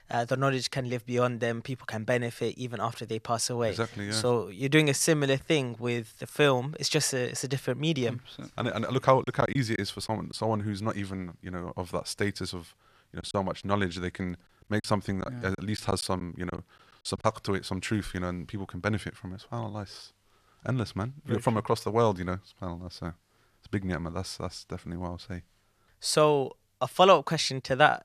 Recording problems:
choppy; very; from 9 to 10 s and from 13 to 17 s; 9% of the speech affected

